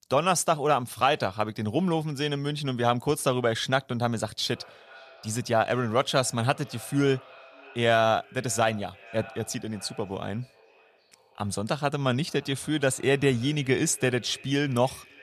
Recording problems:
echo of what is said; faint; from 4.5 s on; 570 ms later, 25 dB below the speech

